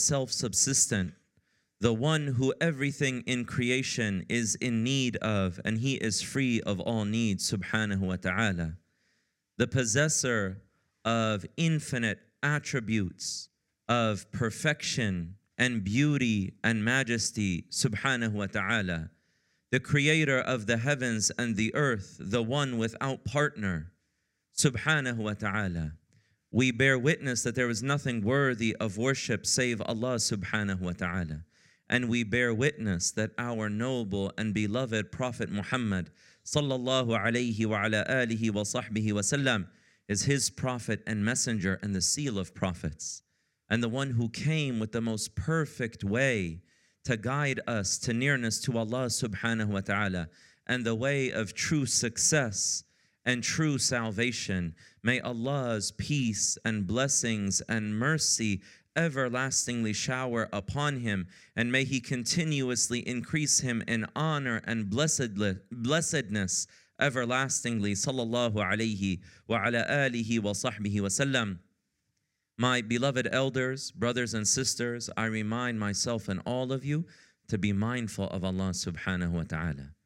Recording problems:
abrupt cut into speech; at the start

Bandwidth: 16 kHz